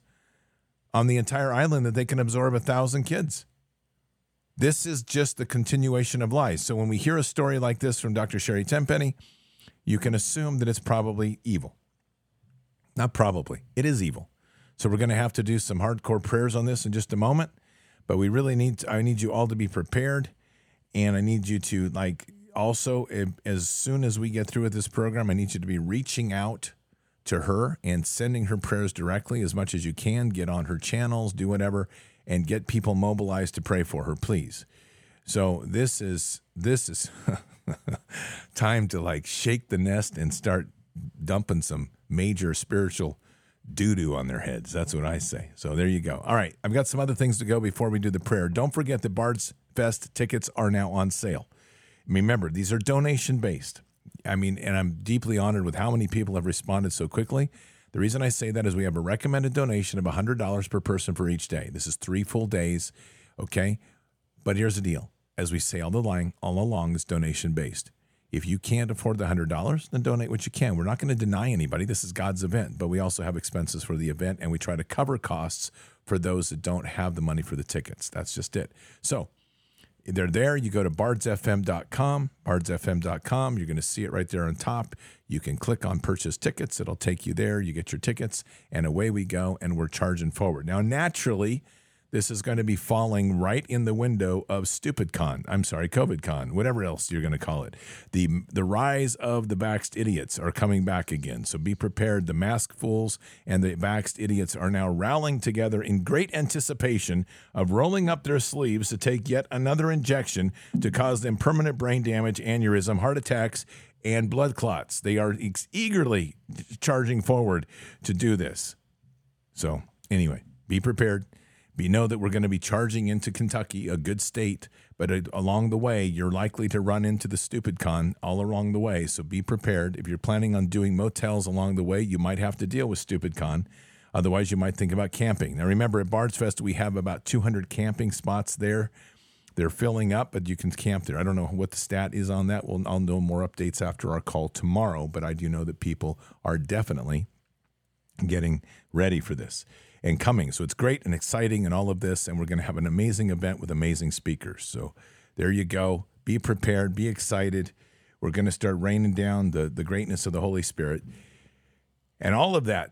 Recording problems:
none

